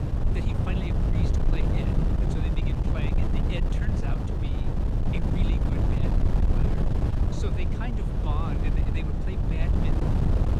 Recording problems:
wind noise on the microphone; heavy; 5 dB above the speech

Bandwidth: 15 kHz